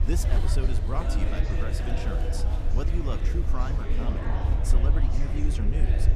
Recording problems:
murmuring crowd; loud; throughout; 2 dB below the speech
low rumble; loud; throughout; 7 dB below the speech

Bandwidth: 14.5 kHz